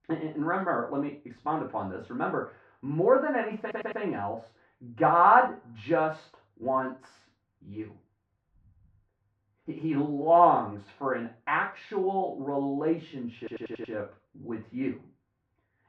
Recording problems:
off-mic speech; far
muffled; very; fading above 1.5 kHz
room echo; noticeable; dies away in 0.3 s
audio stuttering; at 3.5 s and at 13 s

